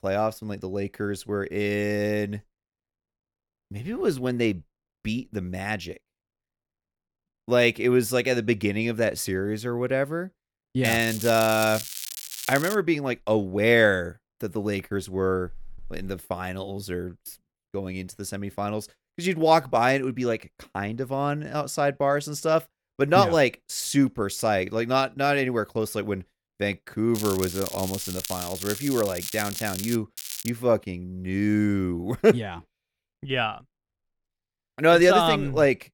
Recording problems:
crackling; loud; from 11 to 13 s, from 27 to 30 s and at 30 s; 8 dB below the speech

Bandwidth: 18 kHz